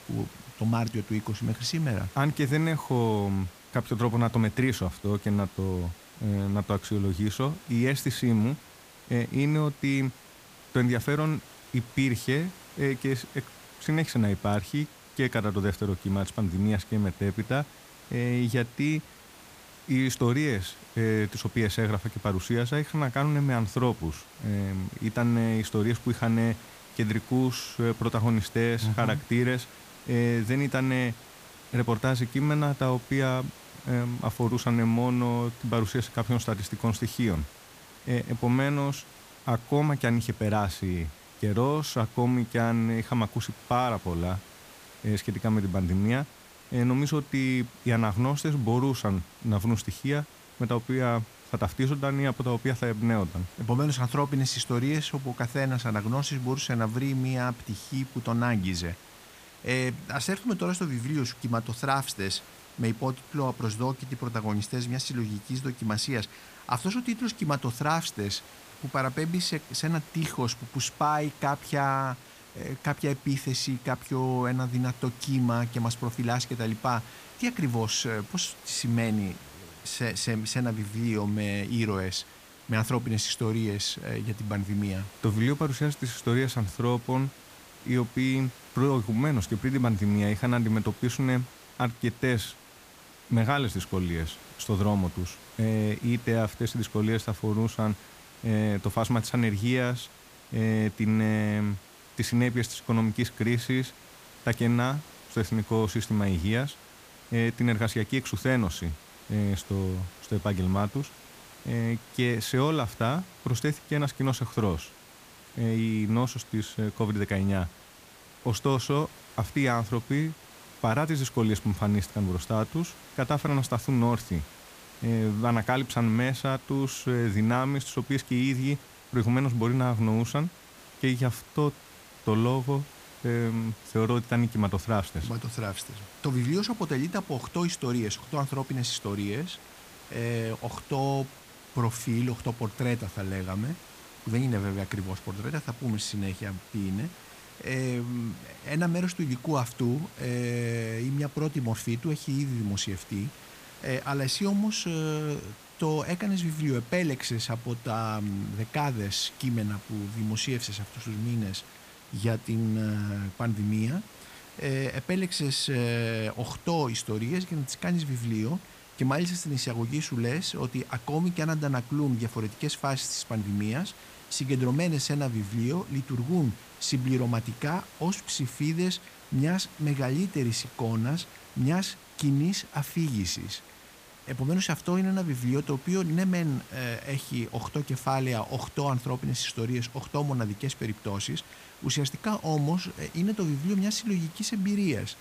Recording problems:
hiss; noticeable; throughout; 20 dB below the speech

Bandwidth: 15 kHz